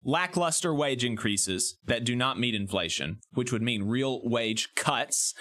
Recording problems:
squashed, flat; somewhat

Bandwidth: 14.5 kHz